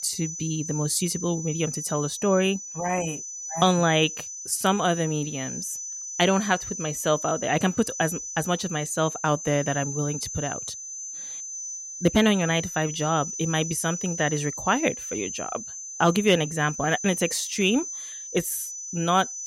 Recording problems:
high-pitched whine; loud; throughout; 6 kHz, 7 dB below the speech

